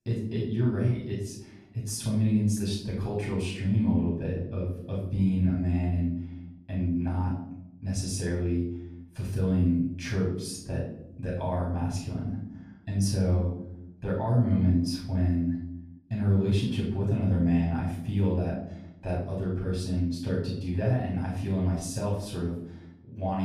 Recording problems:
off-mic speech; far
room echo; noticeable; dies away in 0.8 s
abrupt cut into speech; at the end

